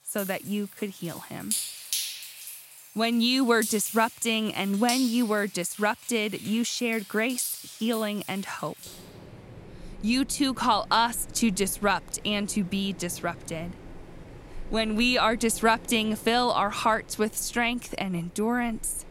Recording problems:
rain or running water; noticeable; throughout; 10 dB below the speech

